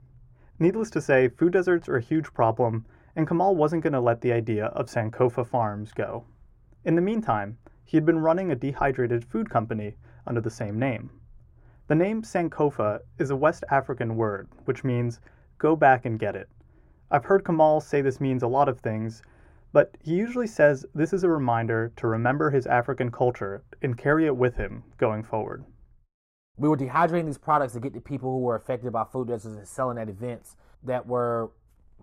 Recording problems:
muffled; very; fading above 2 kHz

